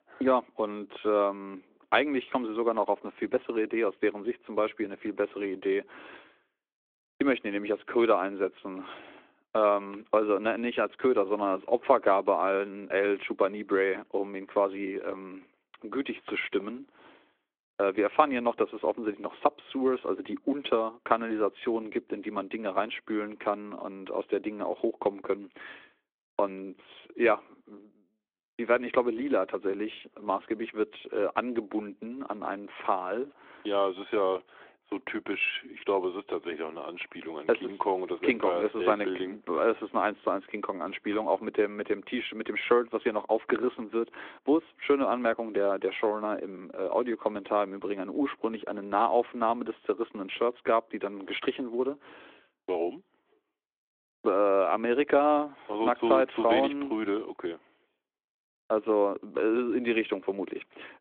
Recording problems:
phone-call audio

